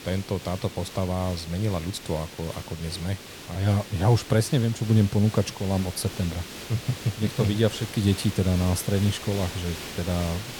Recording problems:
hiss; noticeable; throughout; 10 dB below the speech

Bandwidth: 19 kHz